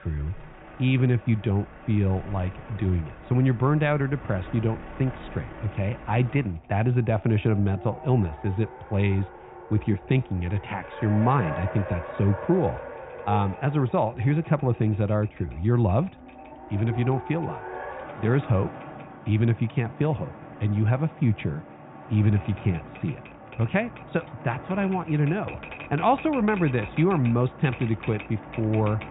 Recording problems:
high frequencies cut off; severe; nothing above 4 kHz
muffled; very slightly; fading above 2.5 kHz
household noises; noticeable; throughout; 20 dB below the speech
traffic noise; noticeable; throughout; 15 dB below the speech

